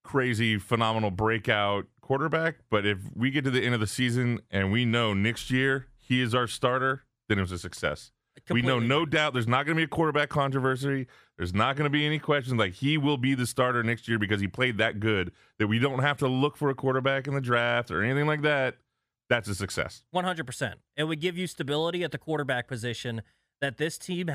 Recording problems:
abrupt cut into speech; at the end

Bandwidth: 15 kHz